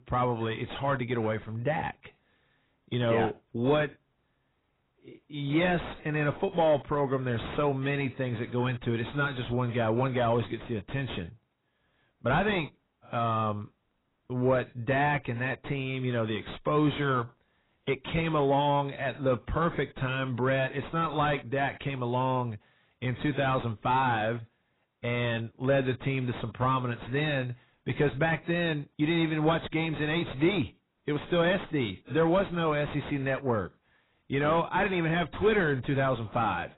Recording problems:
distortion; heavy; 6 dB below the speech
garbled, watery; badly; nothing above 4 kHz

